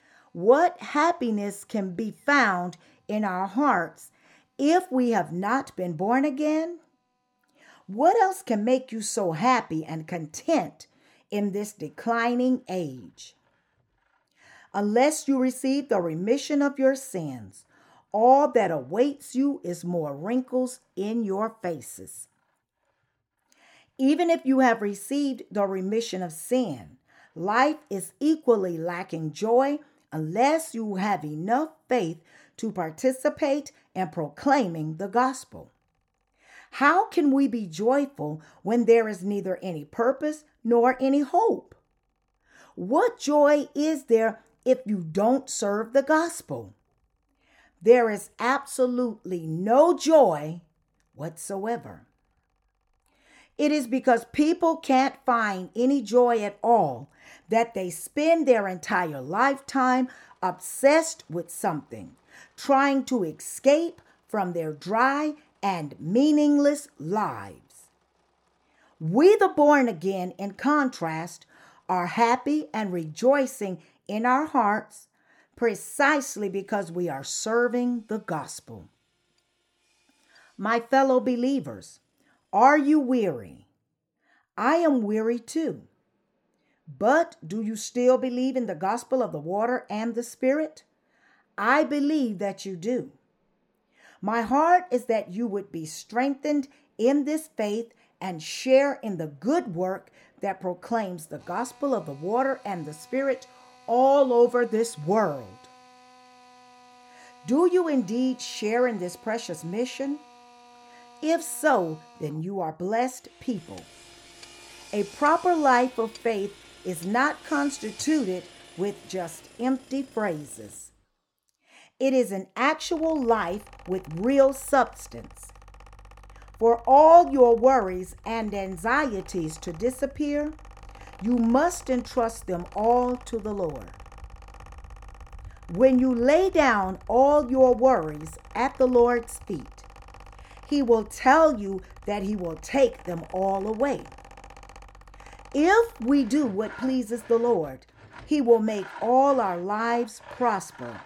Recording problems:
machinery noise; faint; throughout; 25 dB below the speech

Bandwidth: 17 kHz